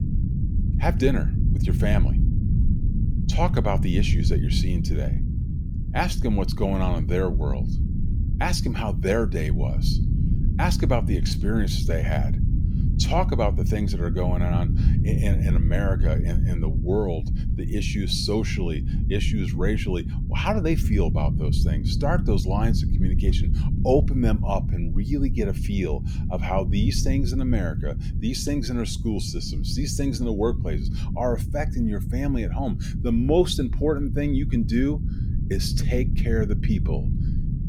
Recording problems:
low rumble; loud; throughout; 9 dB below the speech

